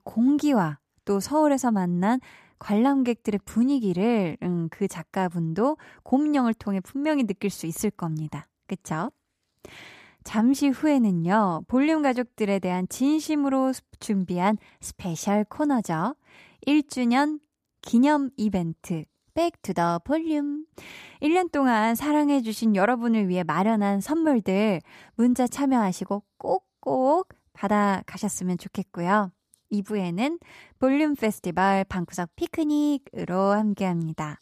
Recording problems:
none

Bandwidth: 14.5 kHz